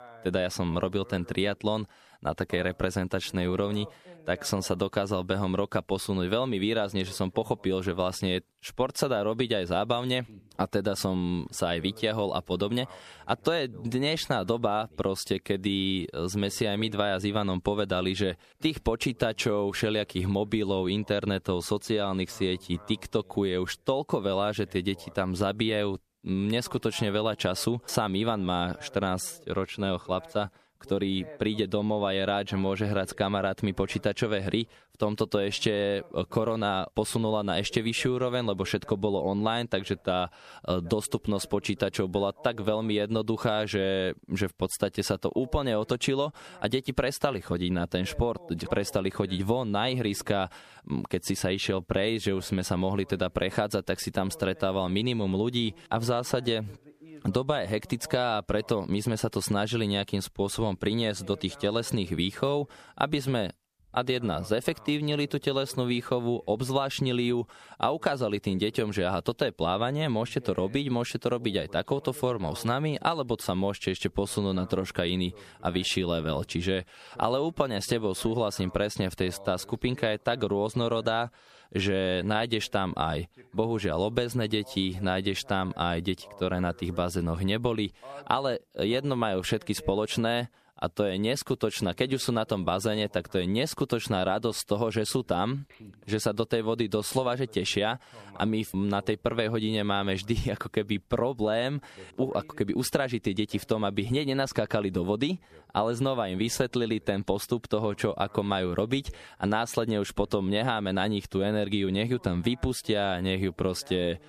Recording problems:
squashed, flat; somewhat
voice in the background; faint; throughout; 25 dB below the speech

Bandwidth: 14.5 kHz